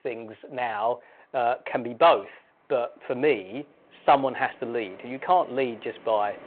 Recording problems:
phone-call audio
wind in the background; faint; throughout; 25 dB below the speech

